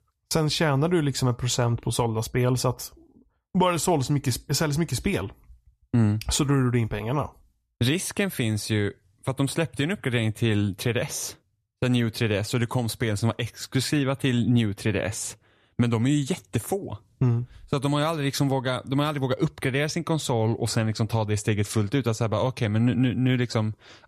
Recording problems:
none

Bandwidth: 14.5 kHz